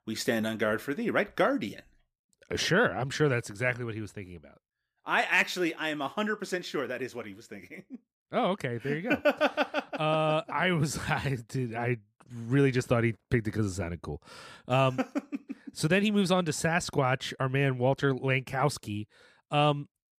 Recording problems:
none

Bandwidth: 15 kHz